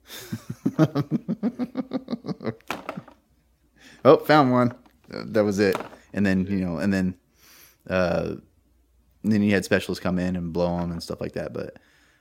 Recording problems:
none

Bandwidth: 16 kHz